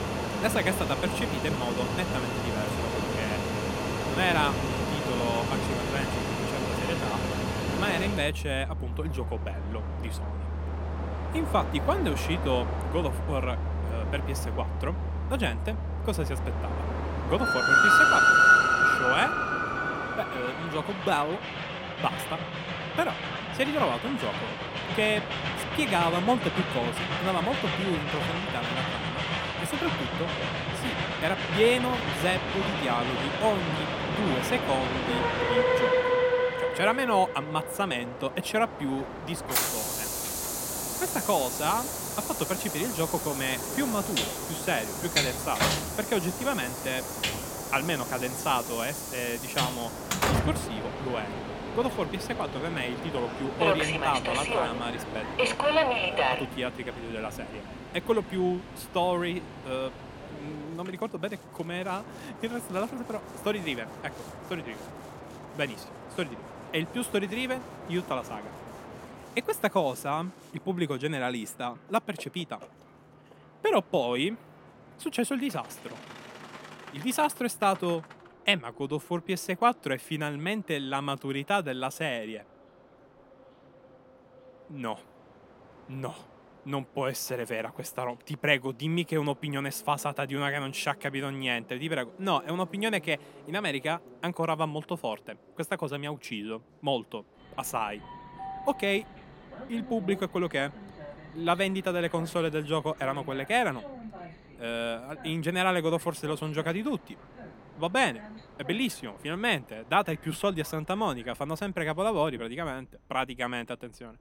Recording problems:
train or aircraft noise; very loud; throughout; 2 dB above the speech

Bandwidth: 16.5 kHz